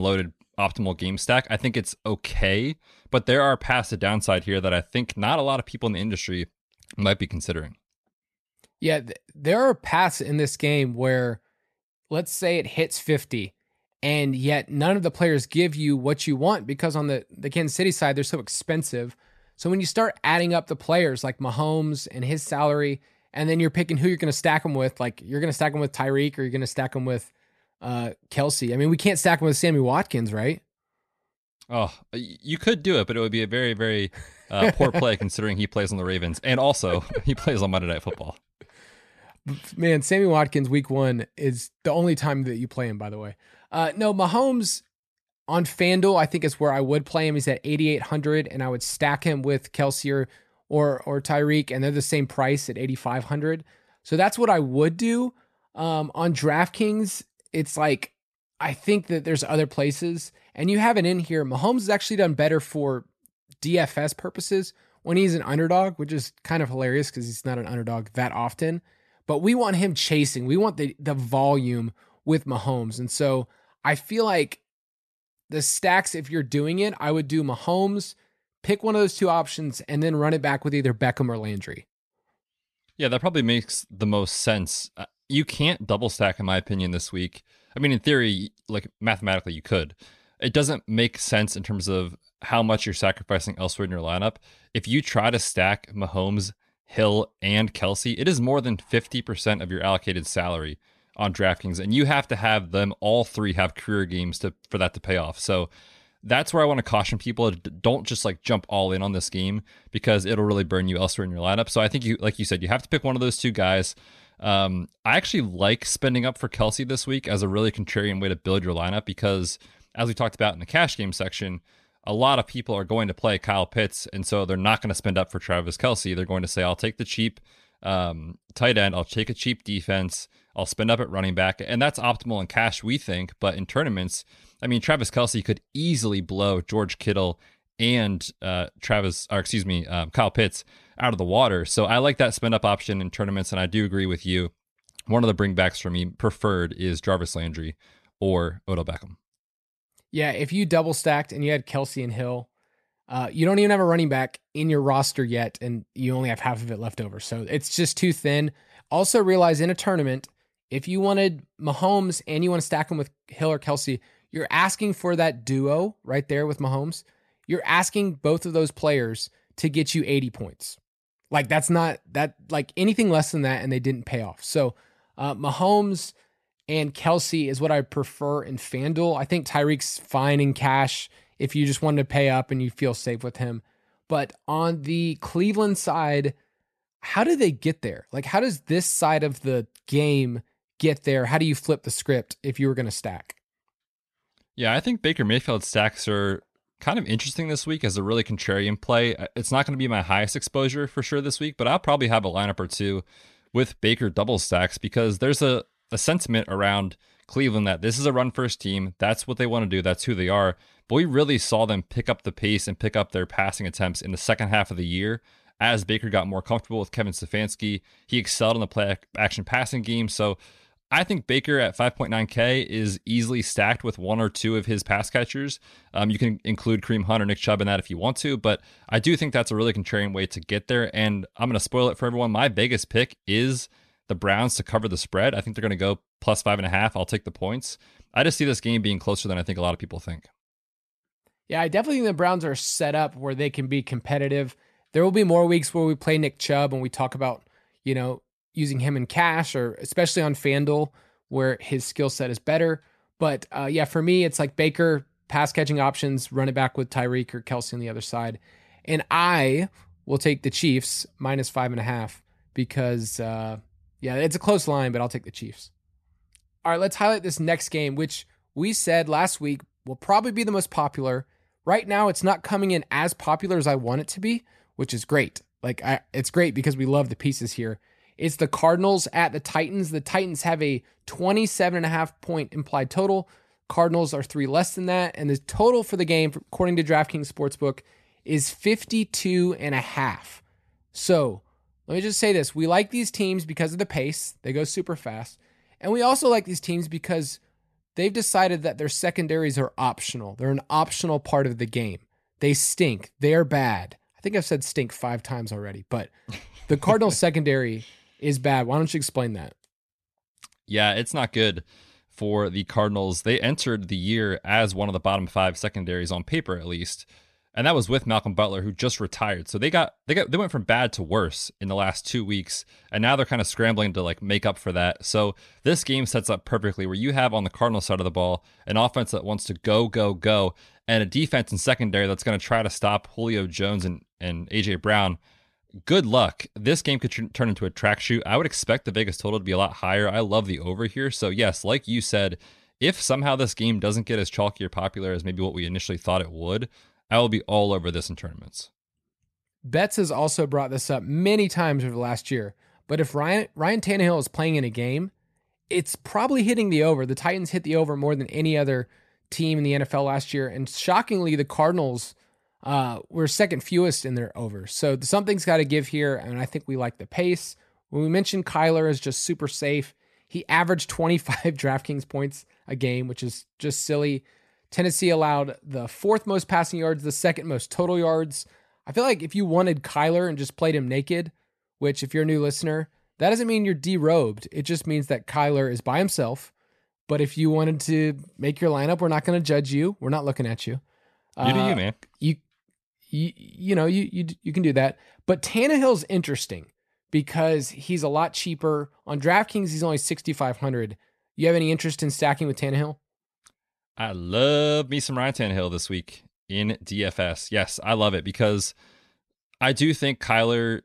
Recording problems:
abrupt cut into speech; at the start

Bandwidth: 13.5 kHz